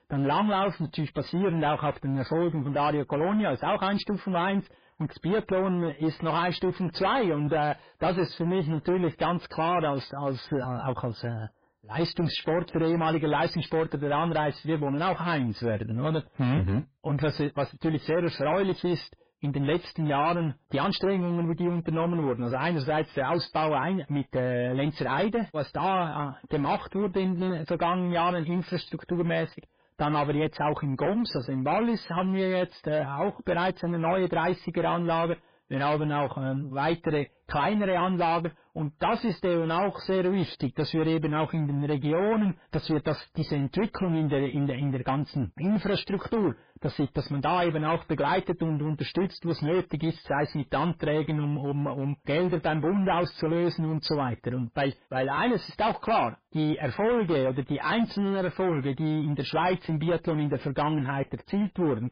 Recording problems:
garbled, watery; badly; nothing above 5 kHz
distortion; slight; 14% of the sound clipped

